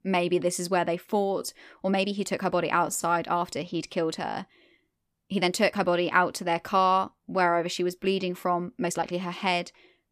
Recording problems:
uneven, jittery; strongly; from 1 to 9 s

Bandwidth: 14.5 kHz